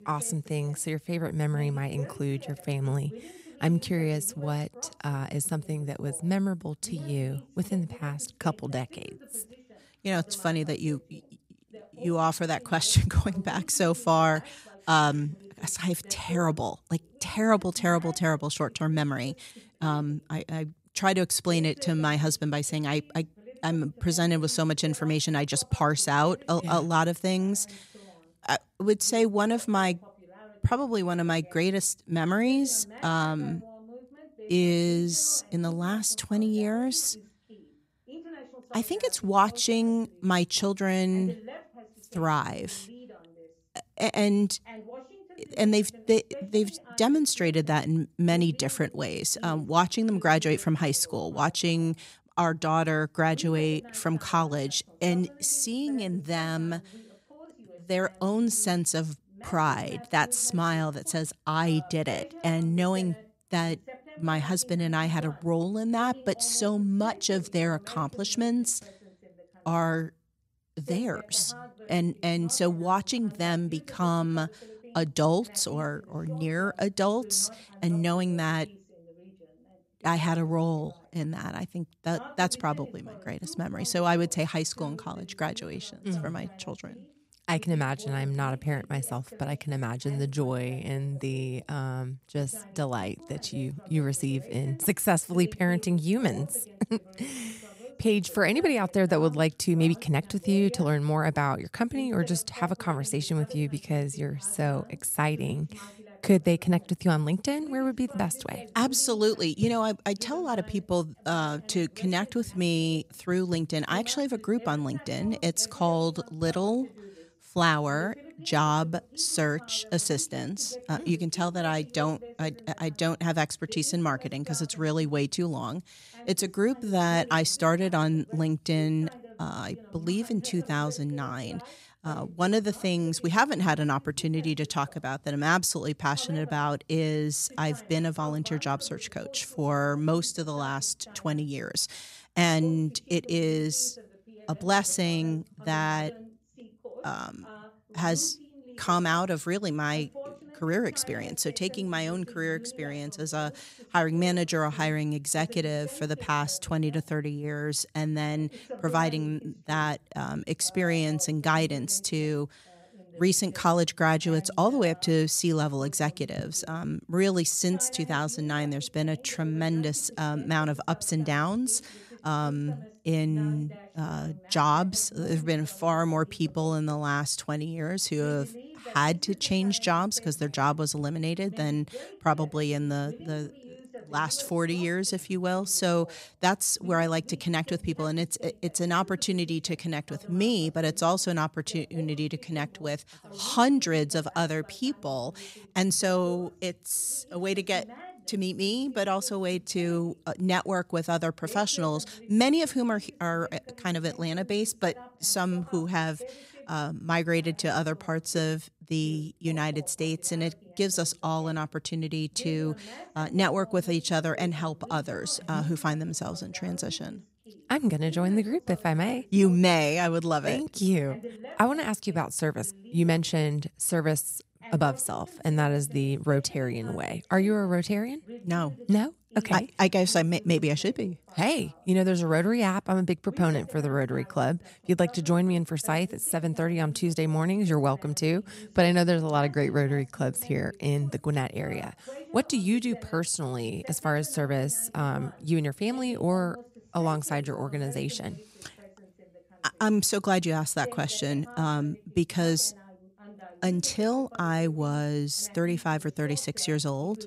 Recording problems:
voice in the background; faint; throughout; 20 dB below the speech

